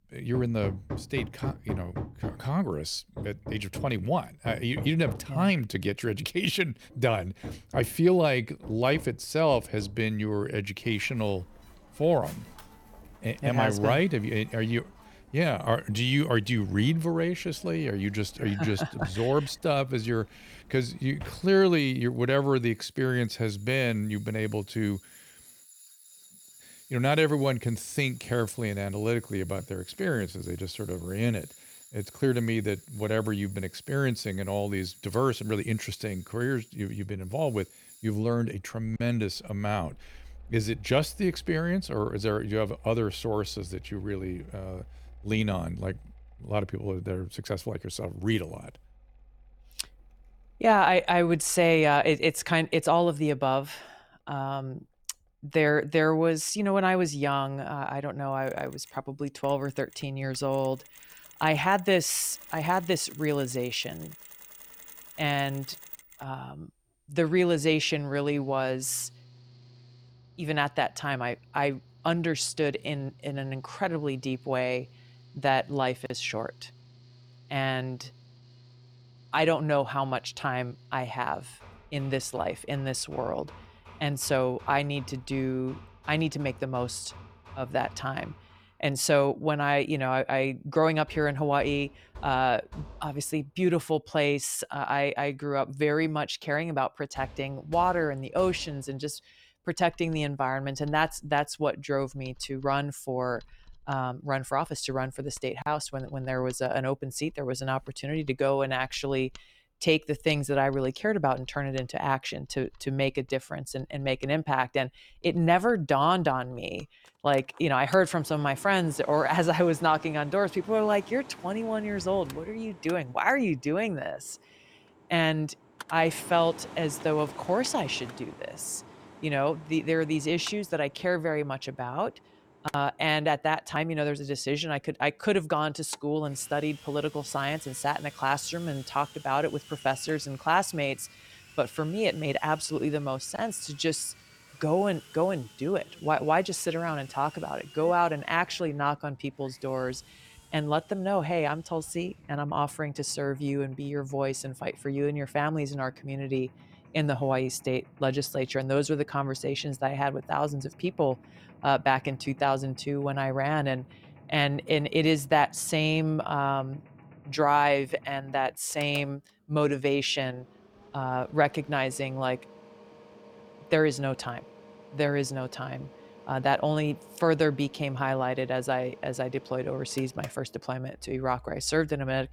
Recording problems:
machinery noise; noticeable; throughout; 20 dB below the speech

